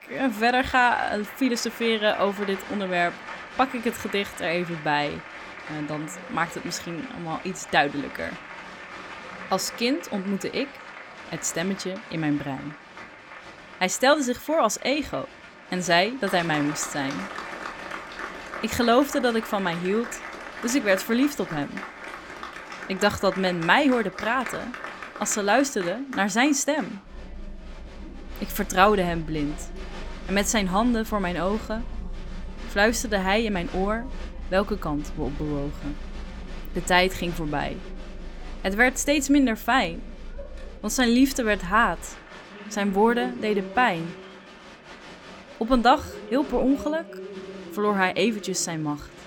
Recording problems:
crowd noise; noticeable; throughout; 15 dB below the speech

